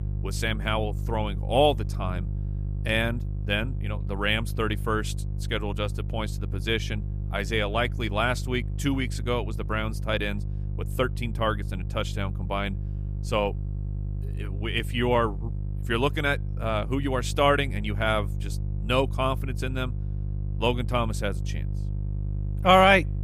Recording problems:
electrical hum; noticeable; throughout; 50 Hz, 20 dB below the speech

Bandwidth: 14.5 kHz